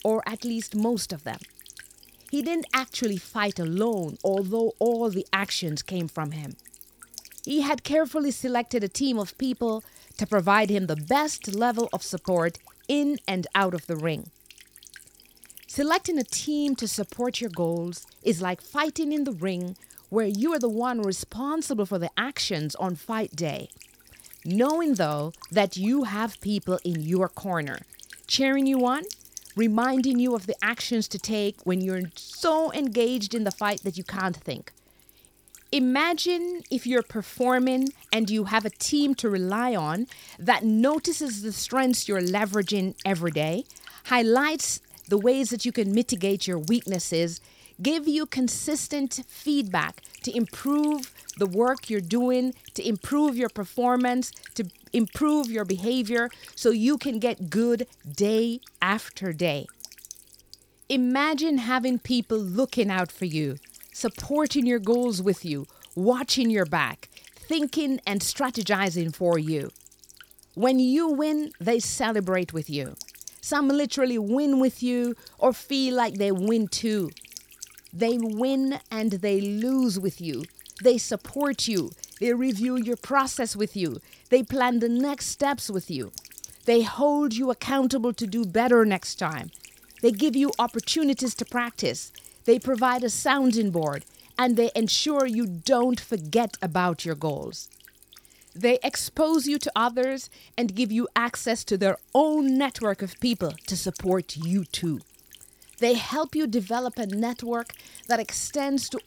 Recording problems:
electrical hum; faint; throughout; 50 Hz, 20 dB below the speech

